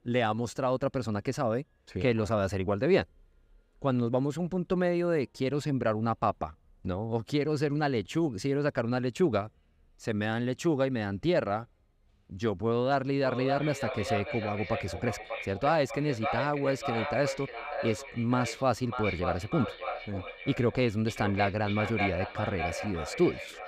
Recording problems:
echo of what is said; strong; from 13 s on; 590 ms later, 6 dB below the speech

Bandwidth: 15.5 kHz